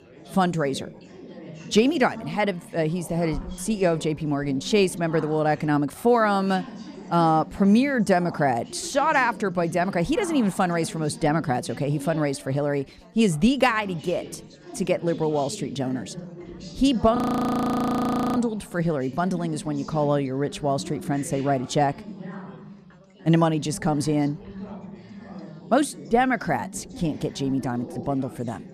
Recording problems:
background chatter; noticeable; throughout; 4 voices, 15 dB below the speech
audio freezing; at 17 s for 1 s

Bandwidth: 15 kHz